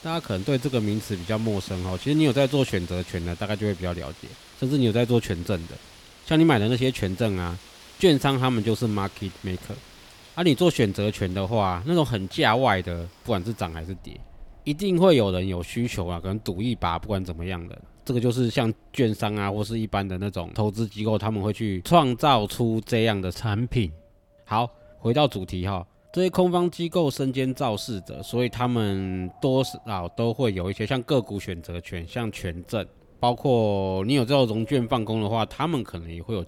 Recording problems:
wind in the background; faint; throughout; 25 dB below the speech

